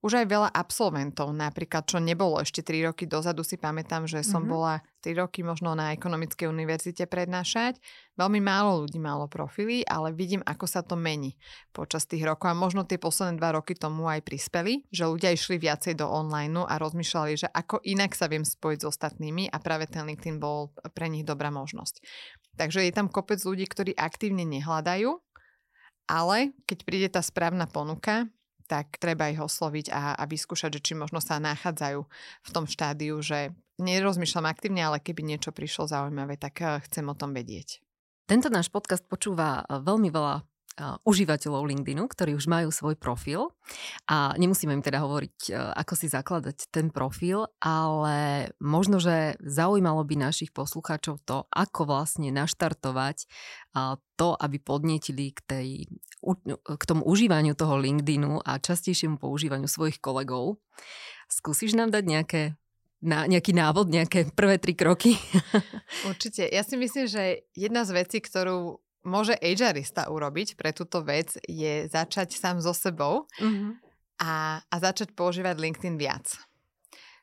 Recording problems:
none

